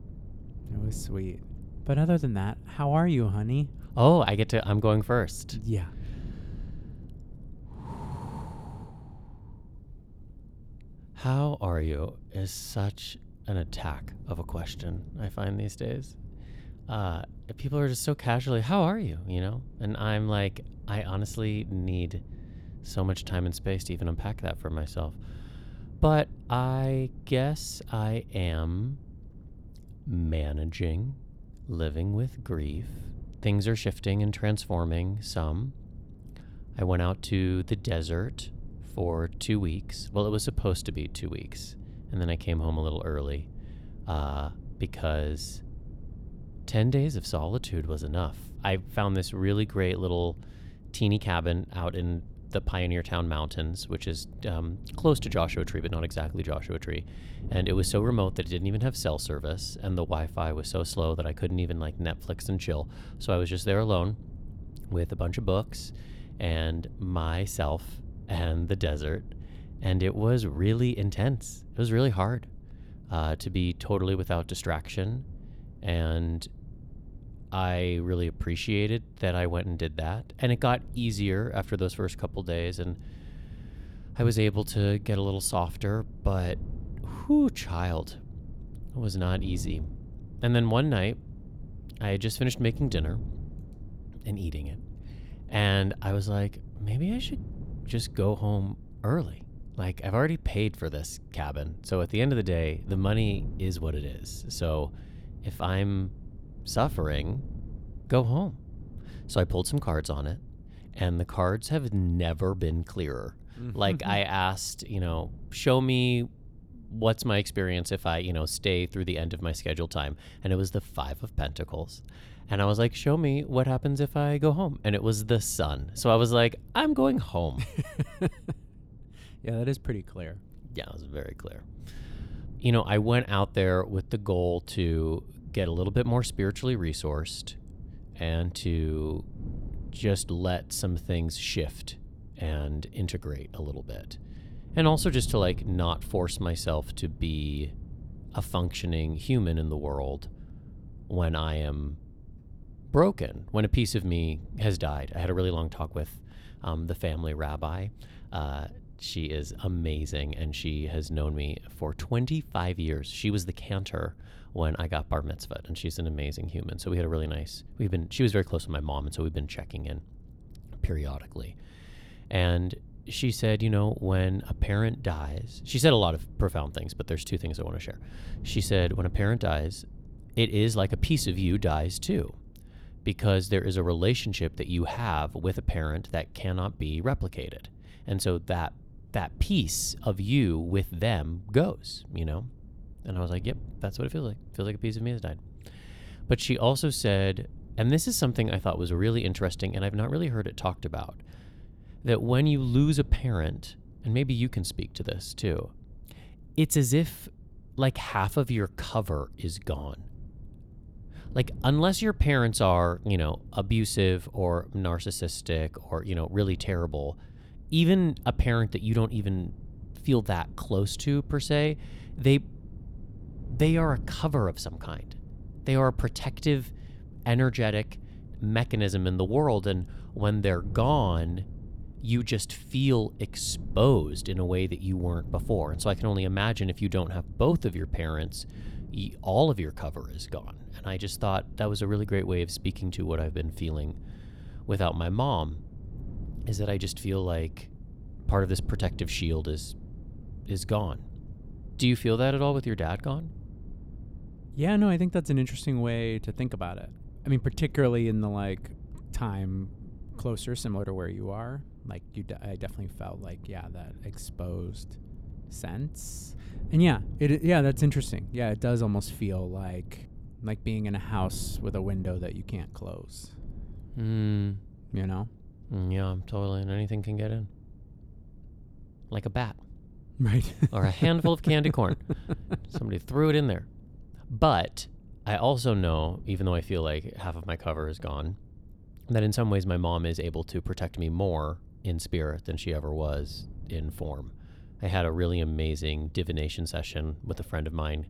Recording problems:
wind noise on the microphone; occasional gusts; 25 dB below the speech

